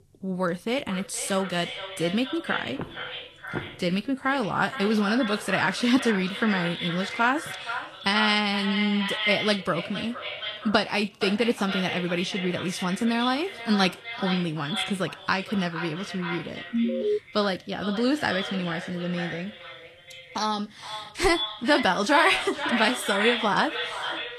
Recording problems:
echo of what is said; strong; throughout; 470 ms later, 7 dB below the speech
garbled, watery; slightly; nothing above 12.5 kHz
footsteps; faint; at 3 s; peak 10 dB below the speech
alarm; loud; at 17 s; peak 1 dB above the speech

